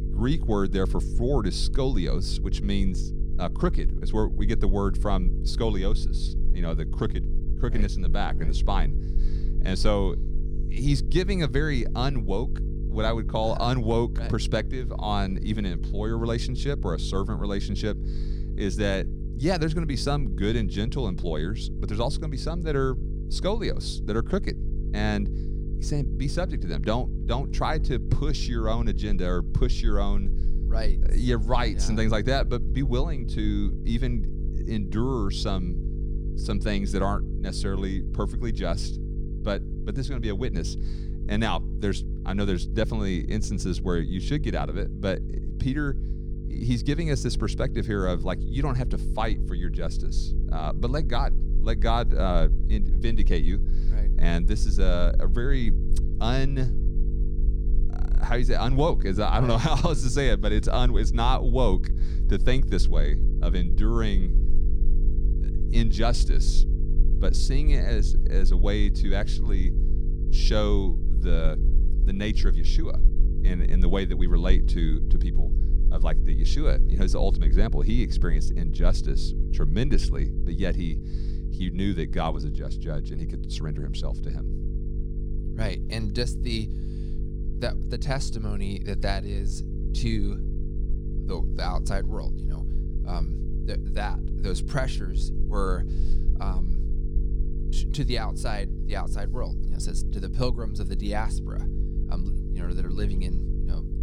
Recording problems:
electrical hum; noticeable; throughout; 50 Hz, 15 dB below the speech
low rumble; faint; throughout; 25 dB below the speech

